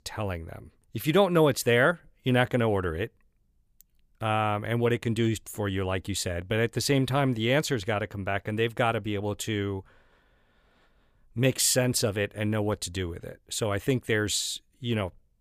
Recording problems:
none

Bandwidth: 15 kHz